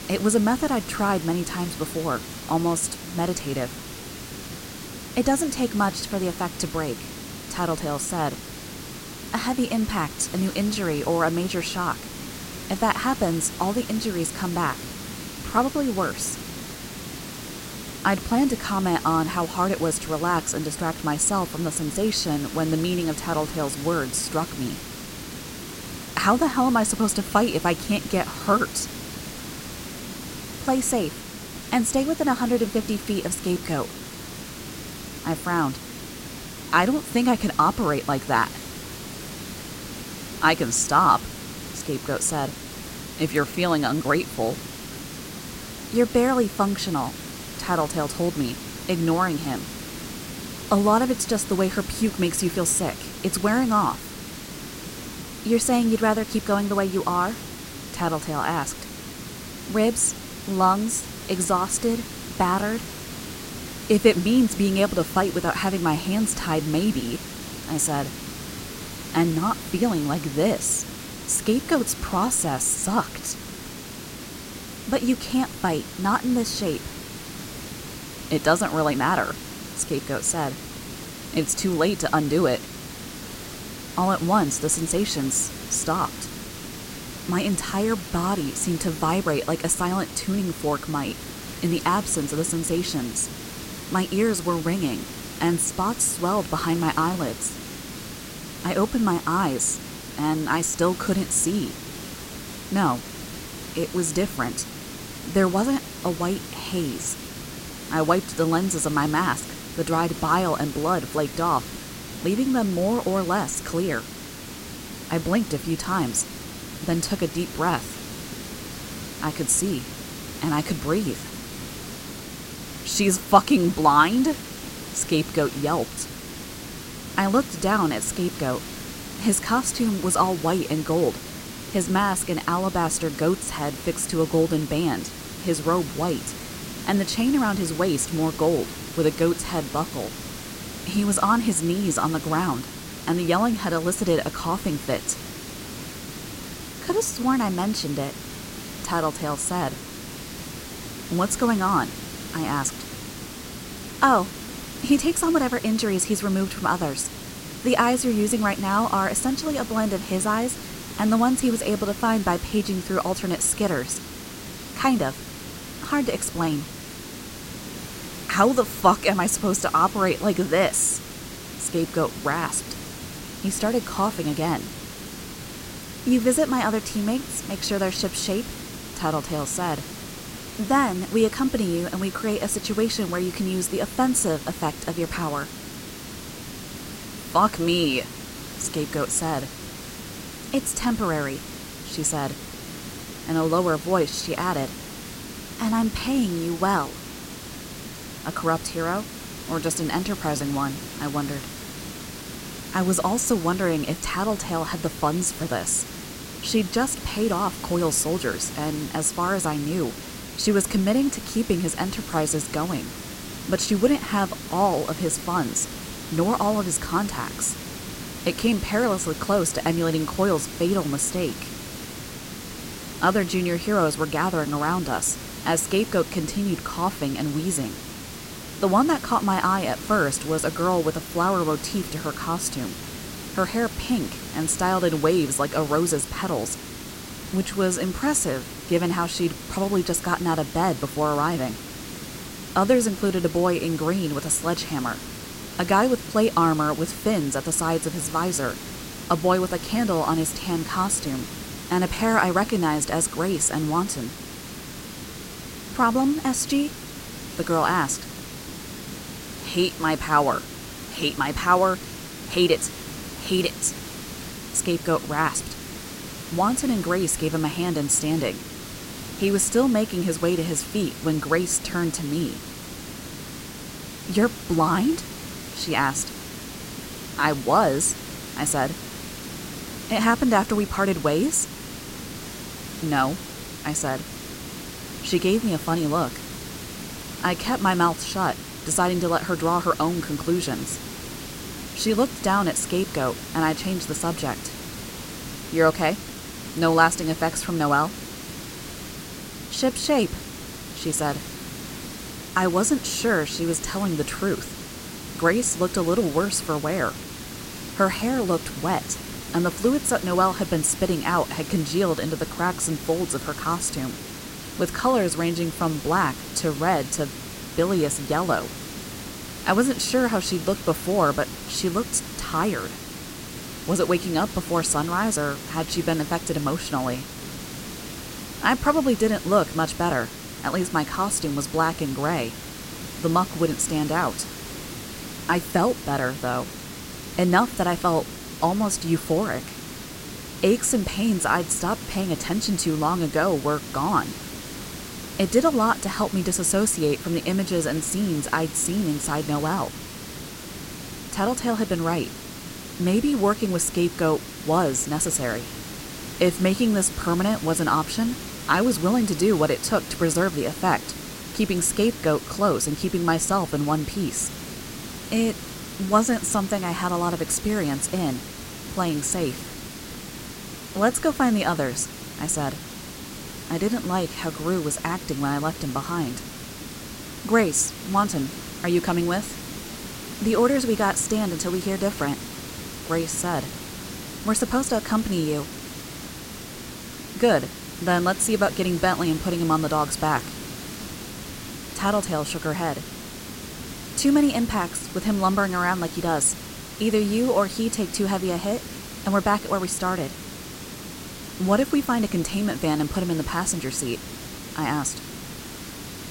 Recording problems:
hiss; noticeable; throughout; 10 dB below the speech

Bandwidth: 16 kHz